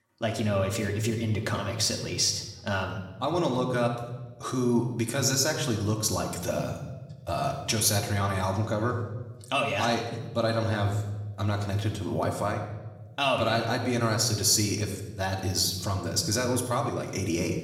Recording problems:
room echo; slight; dies away in 0.9 s
off-mic speech; somewhat distant

